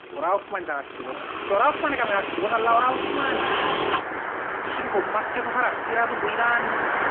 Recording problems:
phone-call audio; nothing above 3 kHz
traffic noise; loud; throughout; 2 dB below the speech

